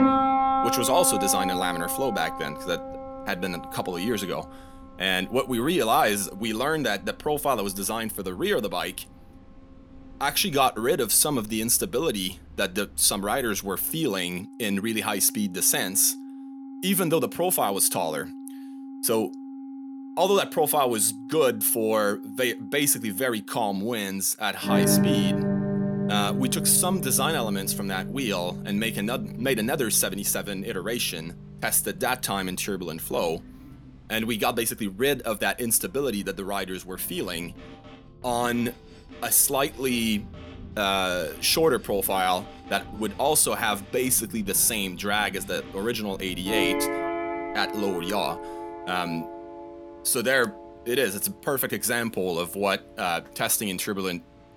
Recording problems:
background music; loud; throughout; 7 dB below the speech

